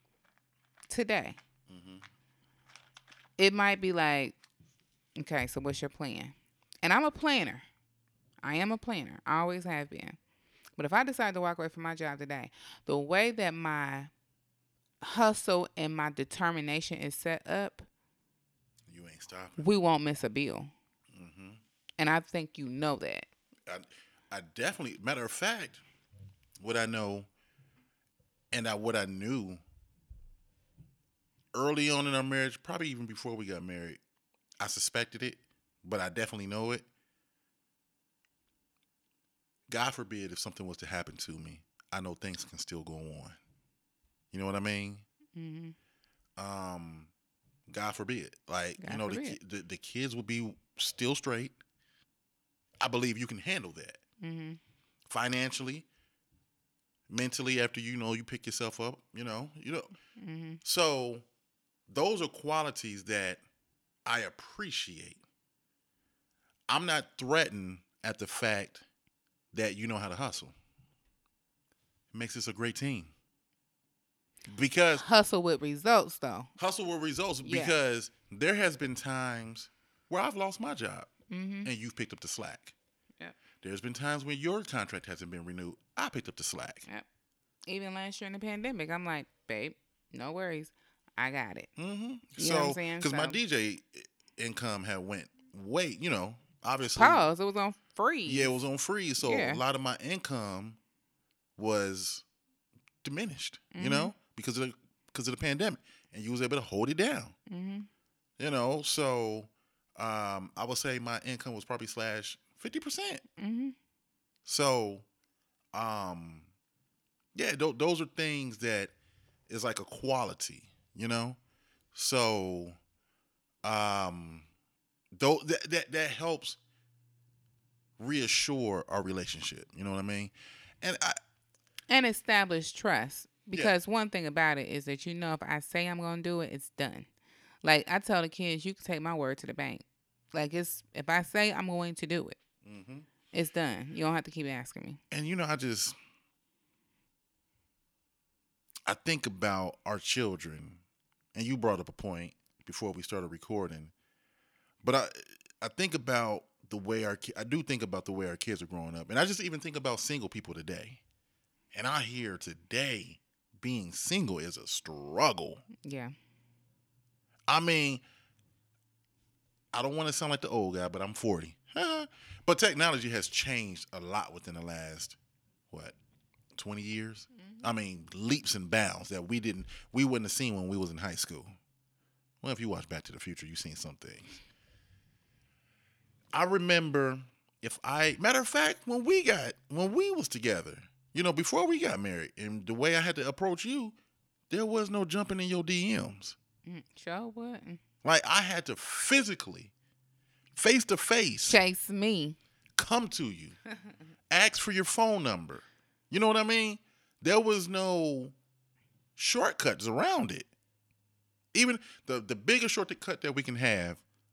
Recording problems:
none

